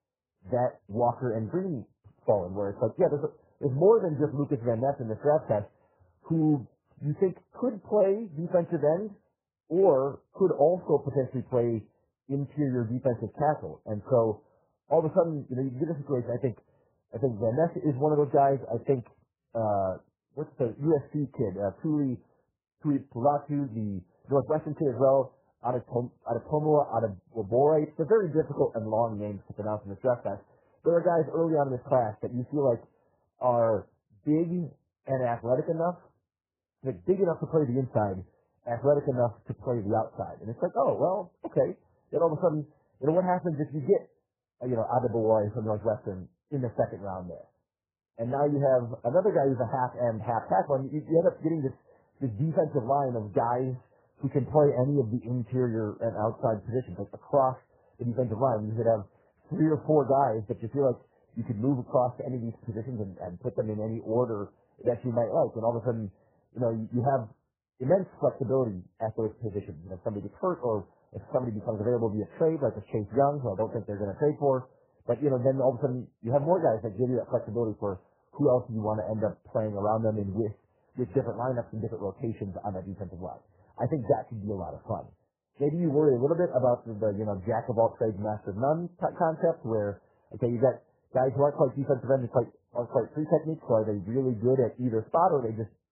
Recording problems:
garbled, watery; badly
muffled; very; fading above 1.5 kHz

